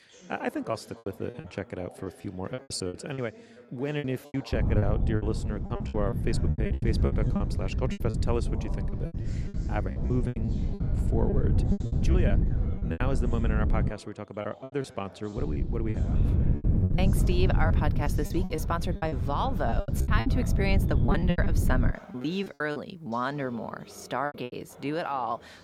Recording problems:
wind noise on the microphone; heavy; from 4.5 to 14 s and from 15 to 22 s; 7 dB below the speech
background chatter; noticeable; throughout; 2 voices, 15 dB below the speech
choppy; very; 13% of the speech affected

